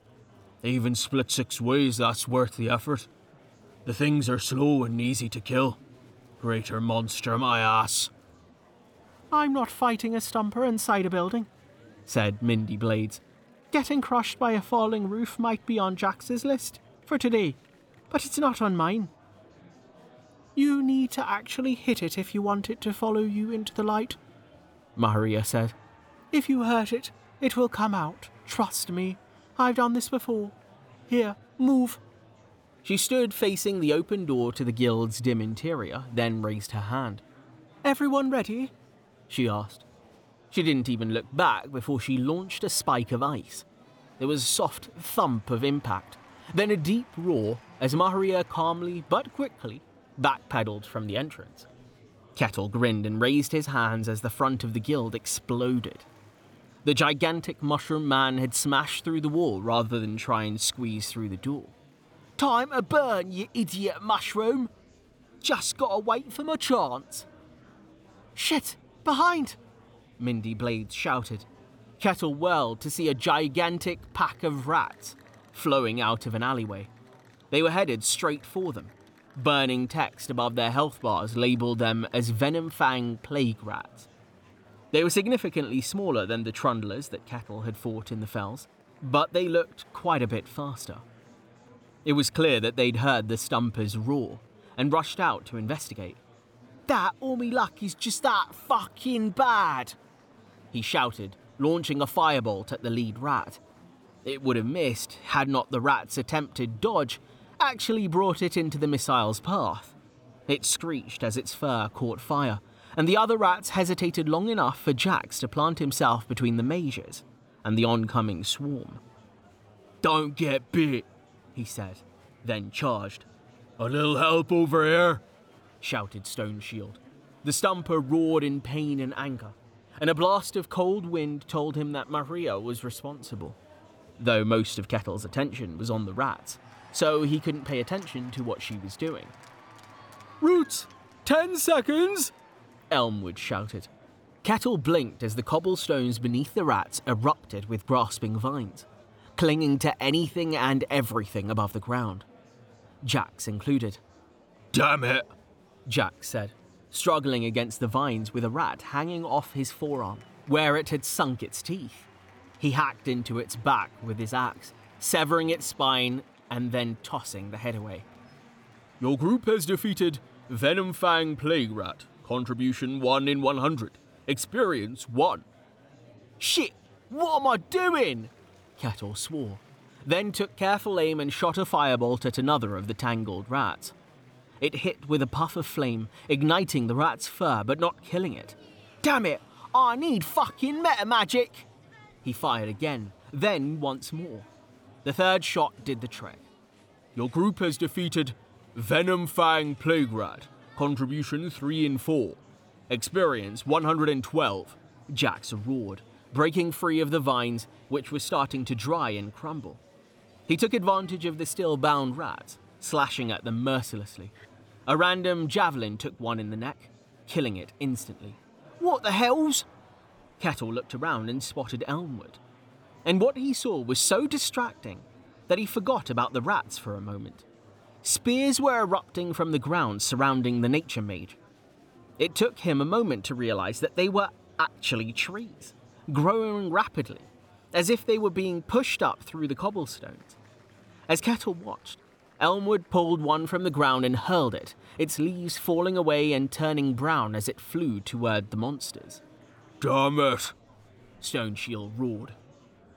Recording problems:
murmuring crowd; faint; throughout; 30 dB below the speech

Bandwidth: 18.5 kHz